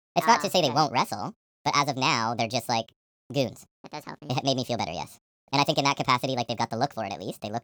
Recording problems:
wrong speed and pitch; too fast and too high; 1.6 times normal speed

